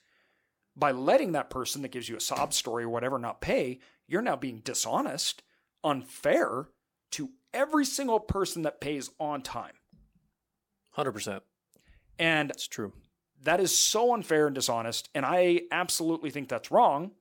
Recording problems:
none

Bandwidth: 17 kHz